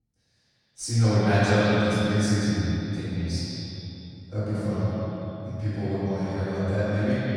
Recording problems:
echo of what is said; strong; throughout; 180 ms later, 7 dB below the speech
room echo; strong; dies away in 3 s
off-mic speech; far

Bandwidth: 19 kHz